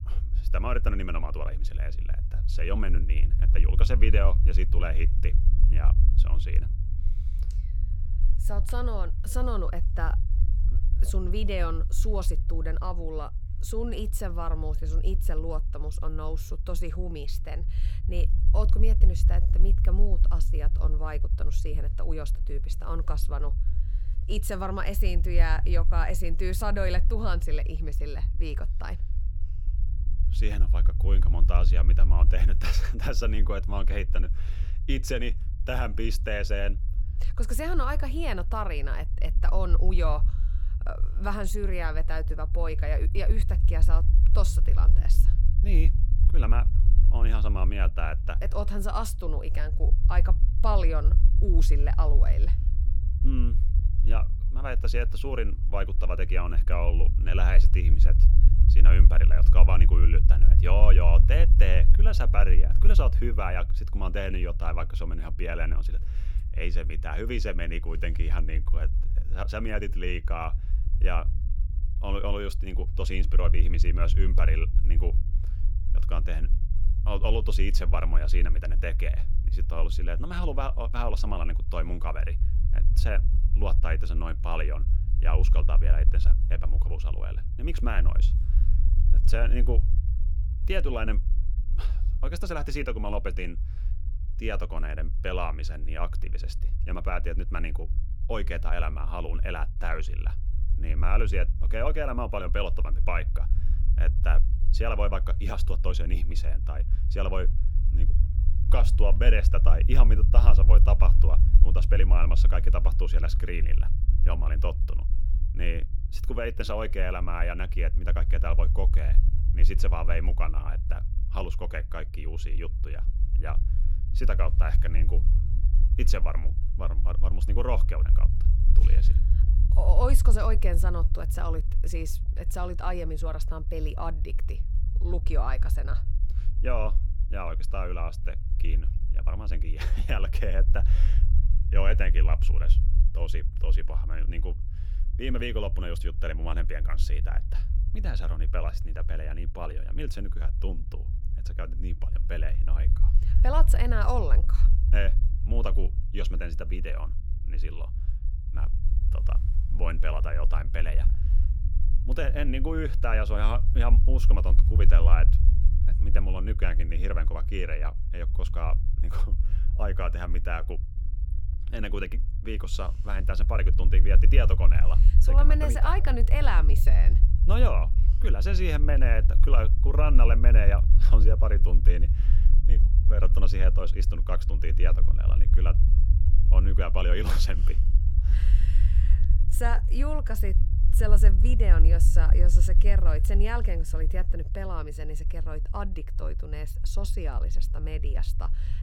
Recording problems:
low rumble; noticeable; throughout; 10 dB below the speech

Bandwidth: 17 kHz